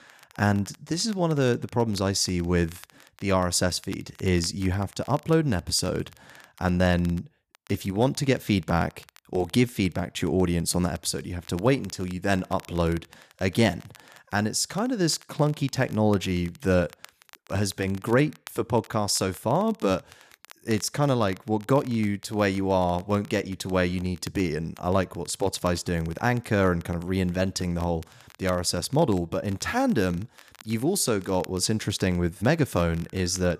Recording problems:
crackle, like an old record; faint; 25 dB below the speech

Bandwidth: 14.5 kHz